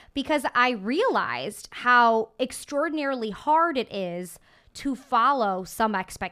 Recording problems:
none

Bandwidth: 14.5 kHz